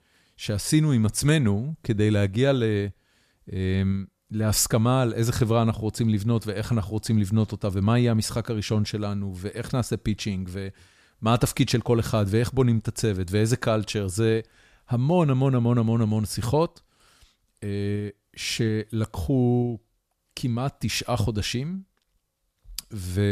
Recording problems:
abrupt cut into speech; at the end

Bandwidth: 14.5 kHz